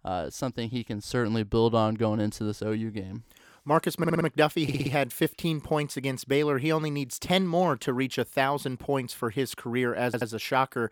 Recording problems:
audio stuttering; at 4 s, at 4.5 s and at 10 s

